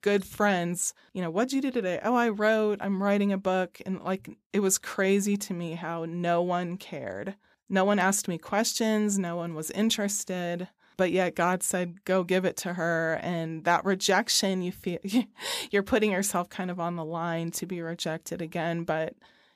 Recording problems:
none

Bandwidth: 14.5 kHz